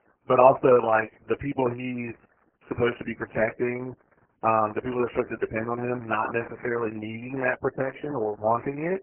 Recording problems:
garbled, watery; badly; nothing above 3 kHz

